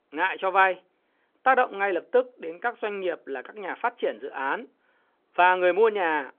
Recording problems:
phone-call audio; nothing above 3.5 kHz

